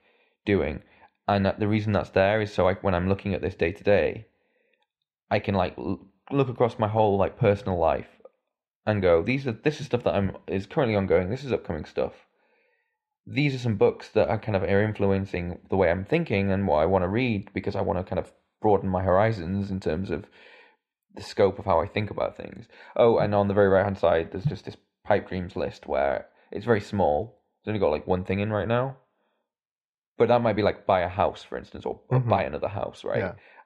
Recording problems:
muffled; slightly; fading above 2.5 kHz

